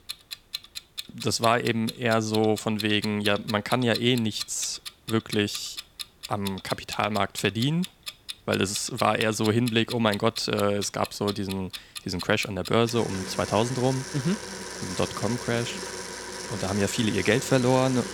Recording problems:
household noises; noticeable; throughout; 10 dB below the speech

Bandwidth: 17.5 kHz